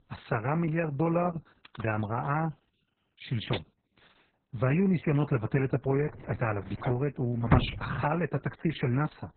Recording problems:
garbled, watery; badly; nothing above 4 kHz
household noises; loud; throughout; 6 dB below the speech

